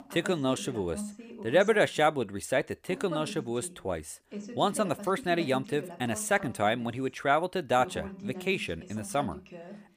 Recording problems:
voice in the background; noticeable; throughout; 15 dB below the speech

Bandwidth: 15 kHz